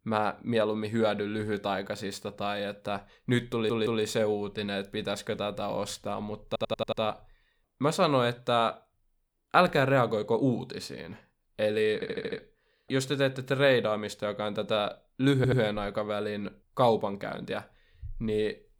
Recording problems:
audio stuttering; 4 times, first at 3.5 s

